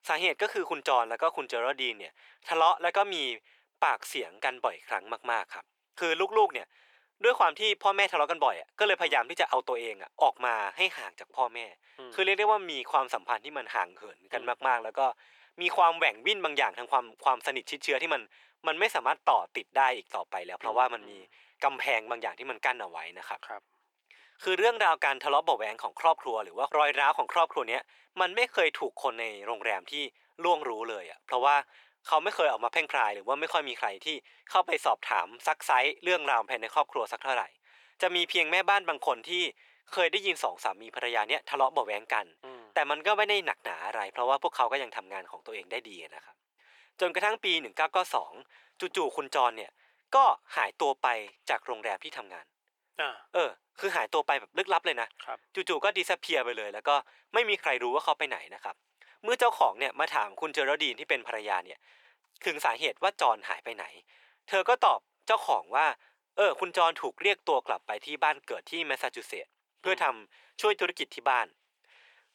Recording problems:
thin; very; fading below 450 Hz

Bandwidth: 18.5 kHz